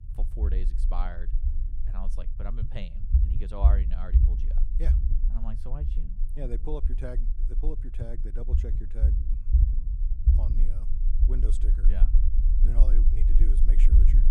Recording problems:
low rumble; loud; throughout; 3 dB below the speech

